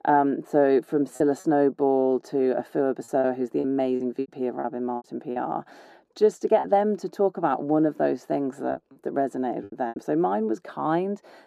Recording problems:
muffled; very; fading above 1 kHz
thin; very slightly; fading below 400 Hz
choppy; very; 7% of the speech affected

